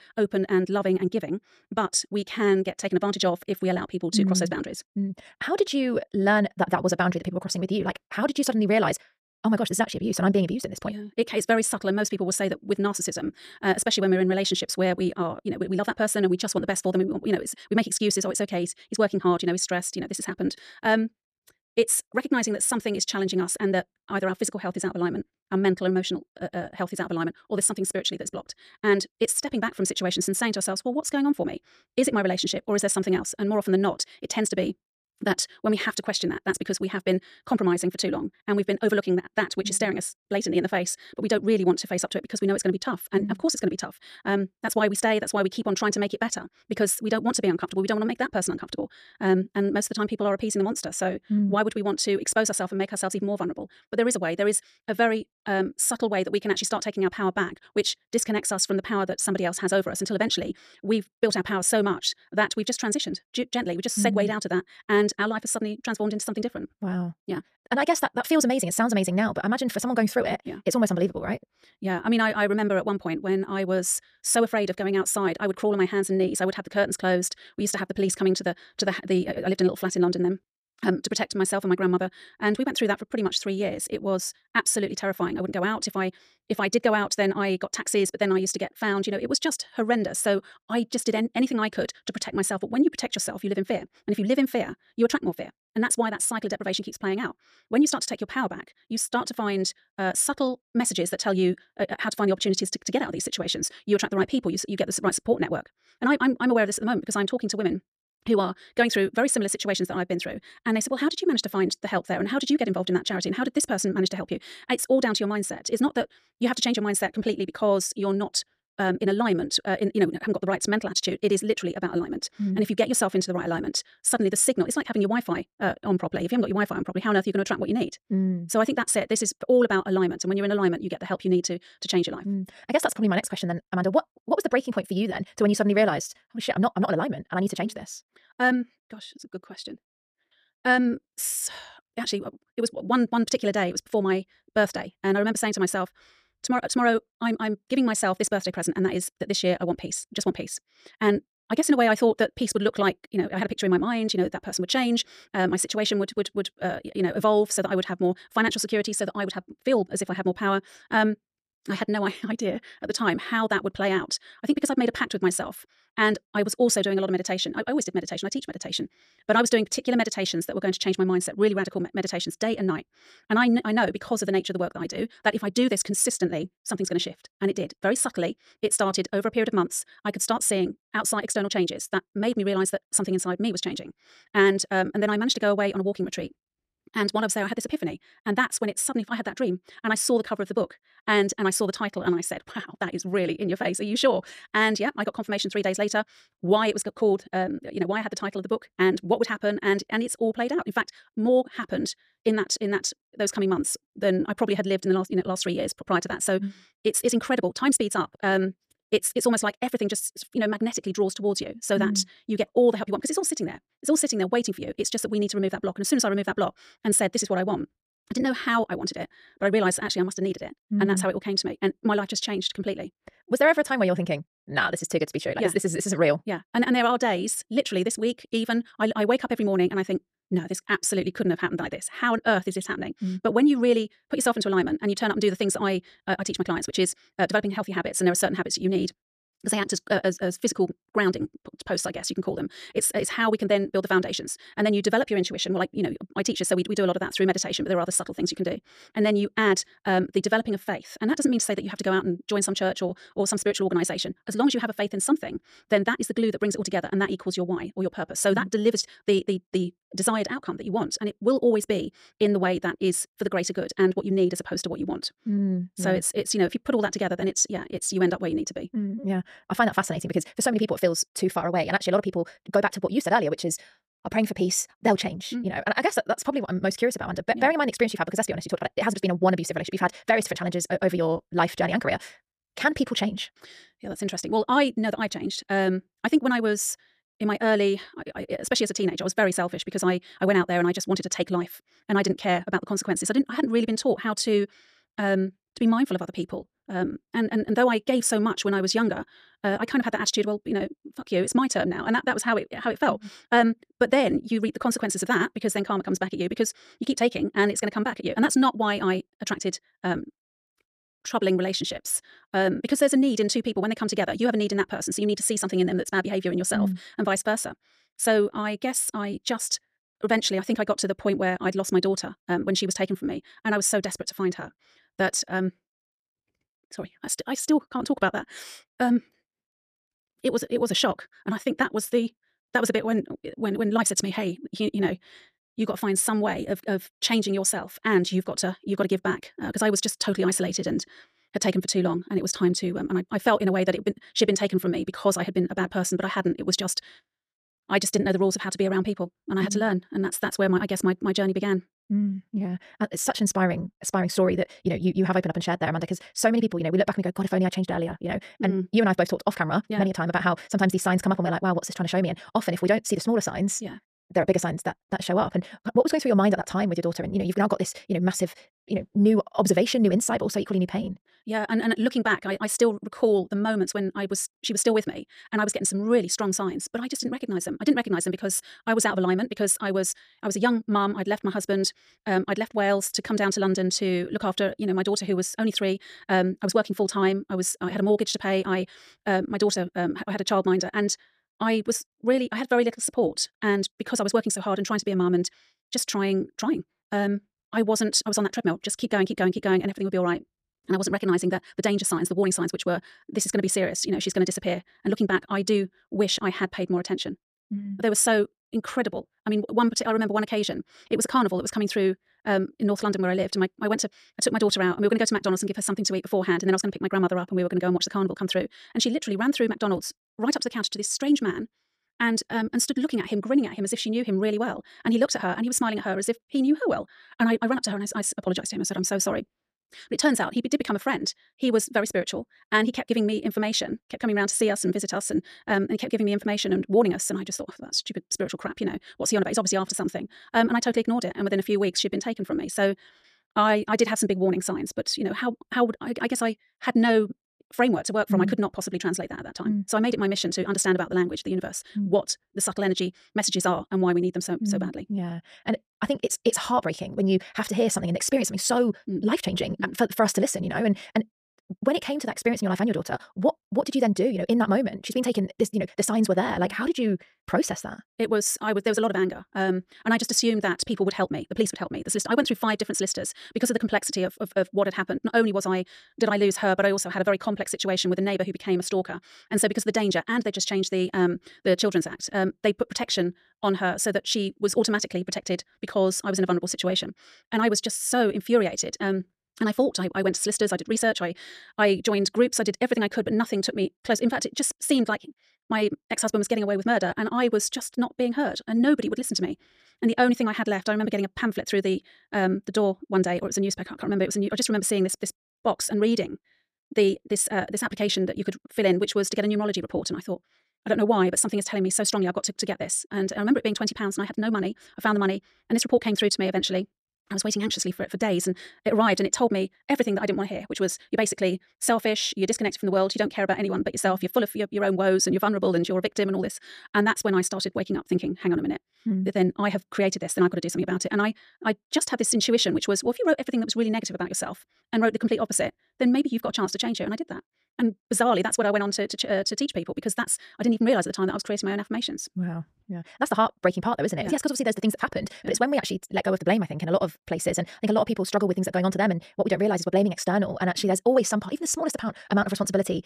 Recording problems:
wrong speed, natural pitch; too fast; 1.8 times normal speed

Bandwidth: 14.5 kHz